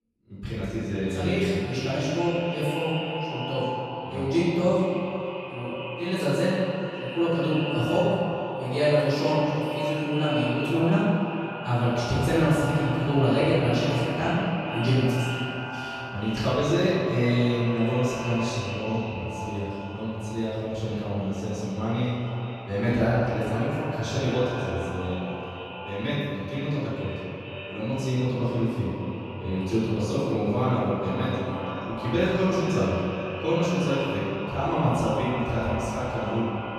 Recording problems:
echo of what is said; strong; throughout; 440 ms later, 8 dB below the speech
room echo; strong; dies away in 1.9 s
off-mic speech; far

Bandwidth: 14 kHz